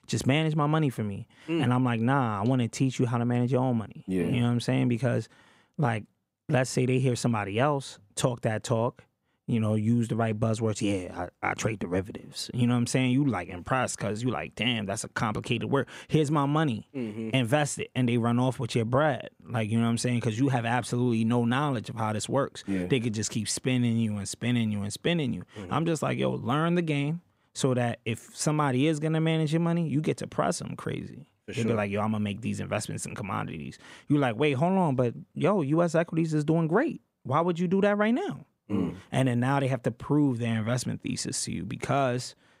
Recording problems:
none

